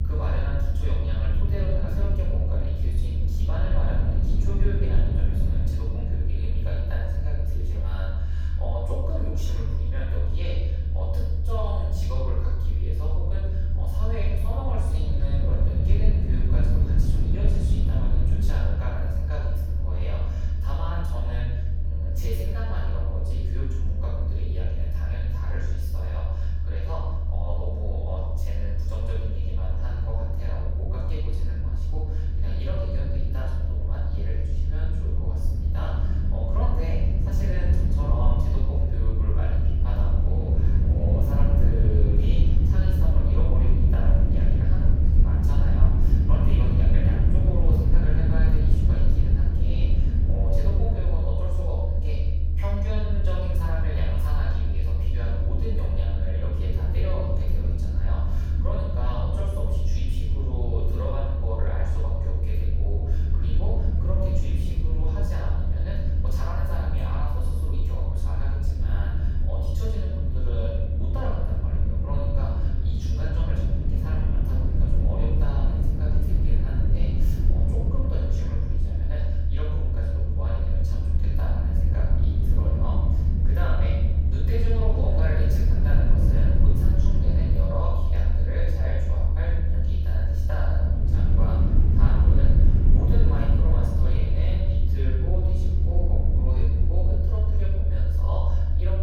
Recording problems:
room echo; strong; dies away in 1 s
off-mic speech; far
low rumble; loud; throughout; 2 dB below the speech

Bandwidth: 17 kHz